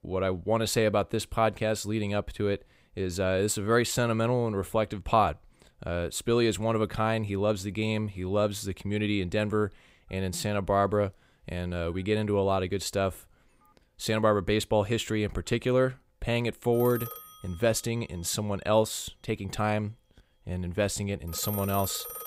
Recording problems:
alarms or sirens; noticeable; from 8.5 s on; 10 dB below the speech

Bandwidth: 15.5 kHz